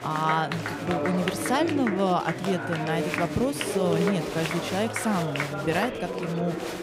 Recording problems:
chatter from many people; loud; throughout; 2 dB below the speech

